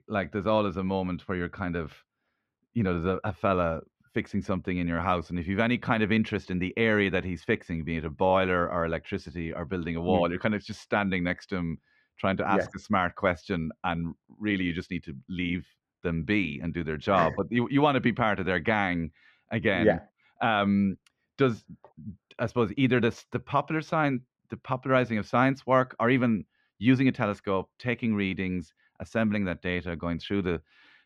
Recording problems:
muffled; very; fading above 2 kHz

